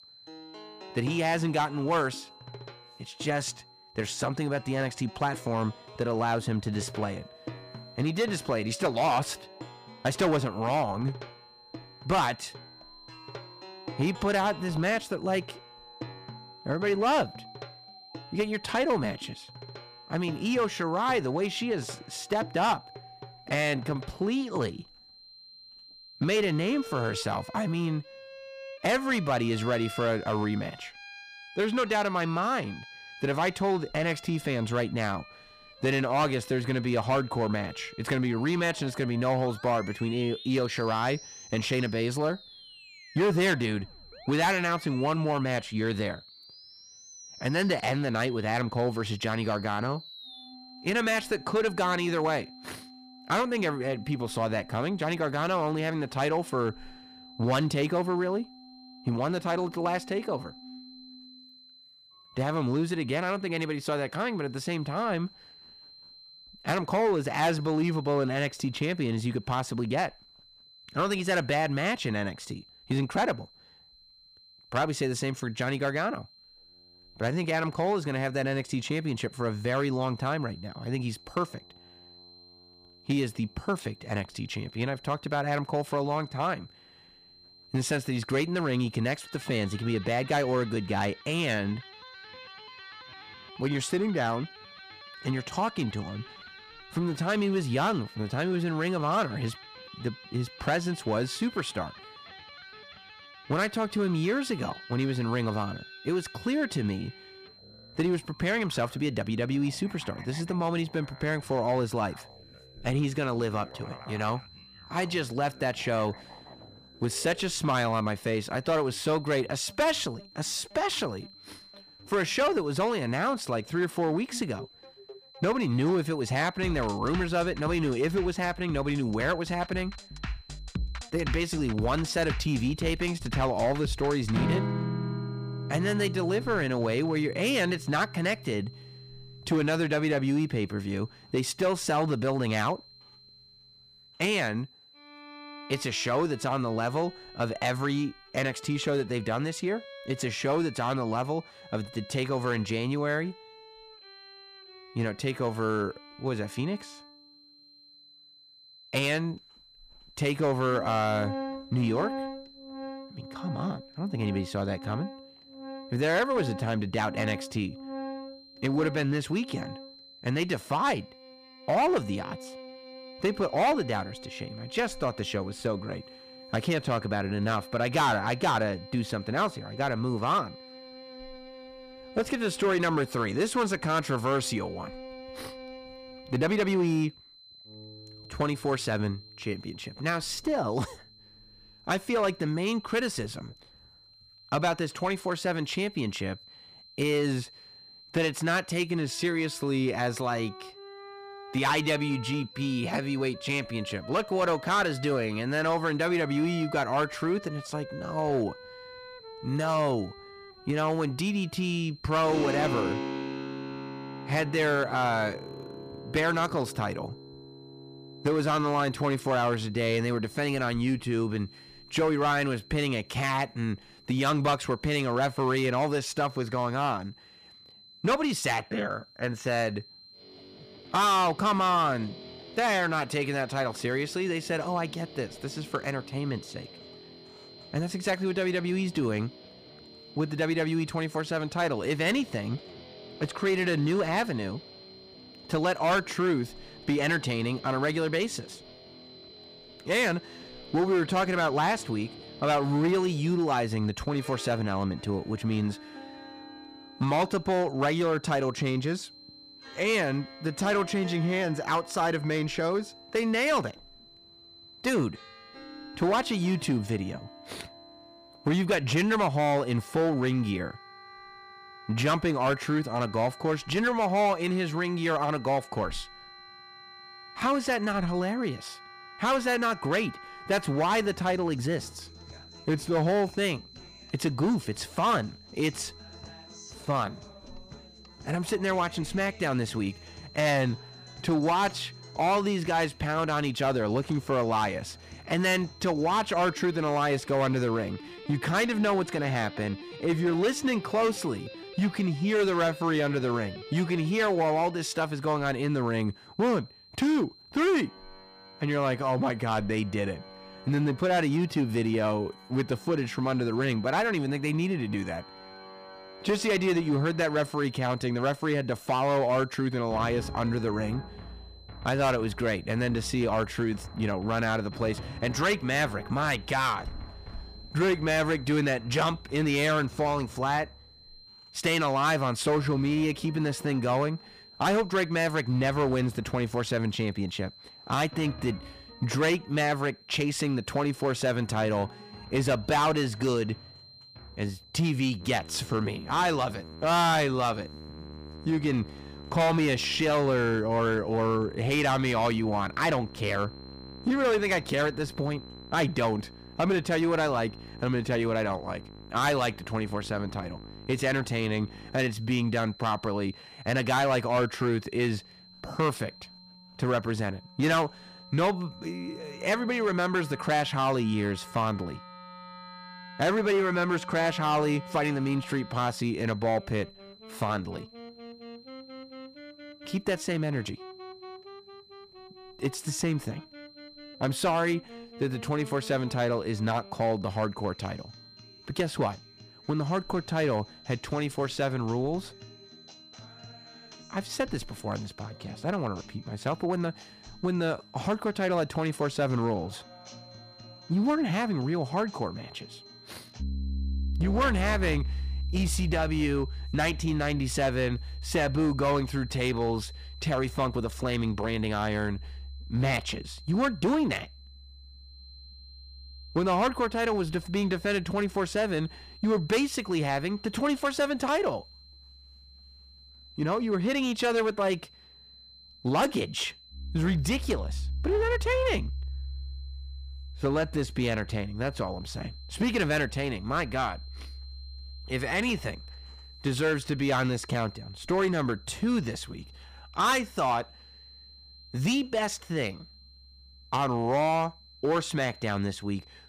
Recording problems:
distortion; slight; 5% of the sound clipped
background music; noticeable; throughout; 15 dB below the speech
high-pitched whine; faint; throughout; 4 kHz, 25 dB below the speech

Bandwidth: 15 kHz